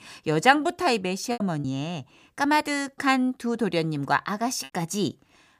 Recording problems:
choppy; occasionally; at 1.5 s; 4% of the speech affected

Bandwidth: 15 kHz